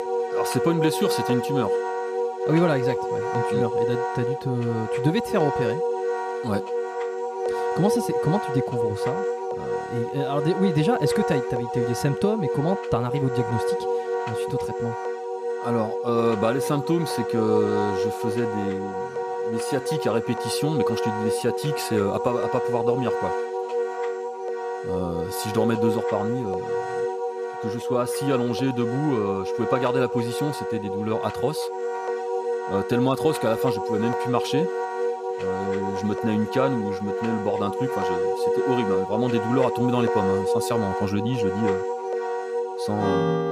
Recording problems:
background music; loud; throughout; as loud as the speech

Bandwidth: 14.5 kHz